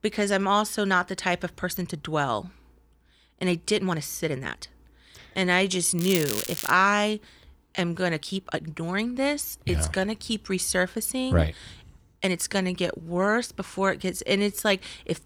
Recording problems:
crackling; loud; at 6 s; 5 dB below the speech
uneven, jittery; strongly; from 1.5 to 15 s

